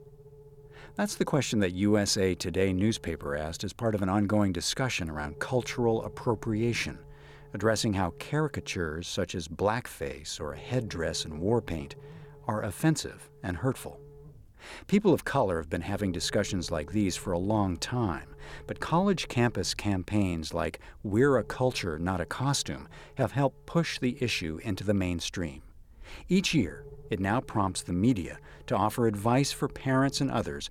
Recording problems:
low rumble; faint; throughout; 25 dB below the speech

